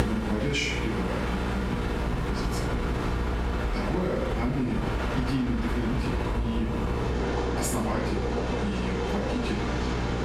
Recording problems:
off-mic speech; far
room echo; noticeable; dies away in 0.5 s
squashed, flat; somewhat
electrical hum; loud; throughout; 60 Hz, 6 dB below the speech
train or aircraft noise; loud; throughout; 1 dB below the speech
low rumble; noticeable; from 1.5 s on; 15 dB below the speech

